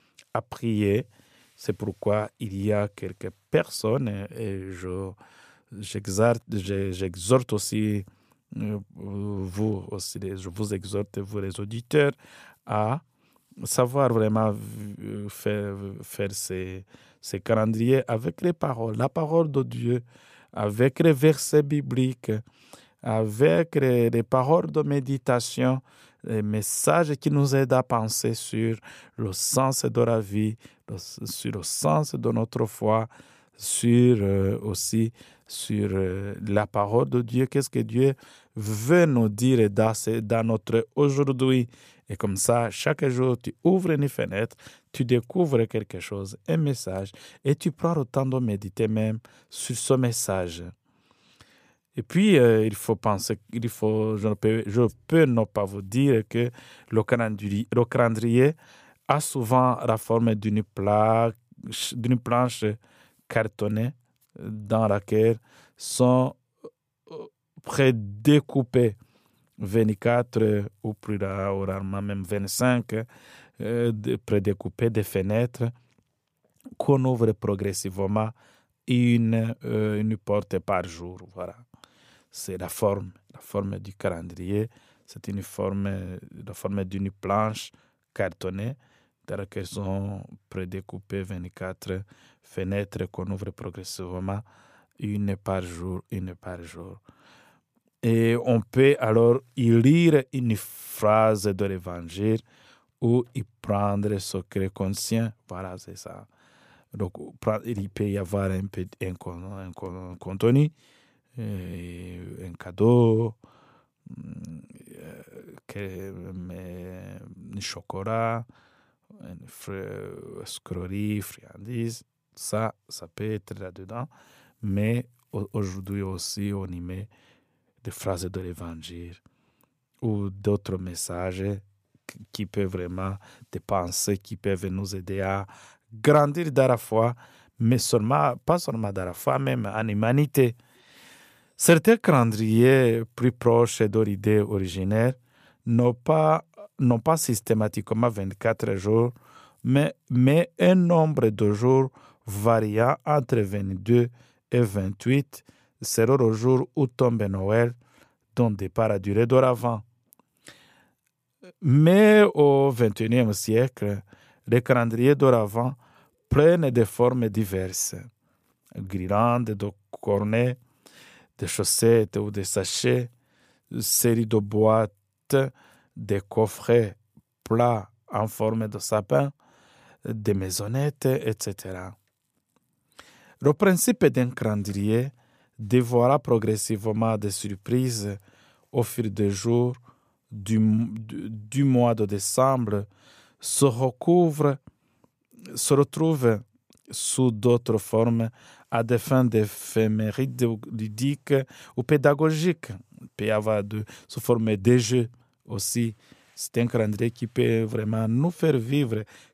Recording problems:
none

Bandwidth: 15 kHz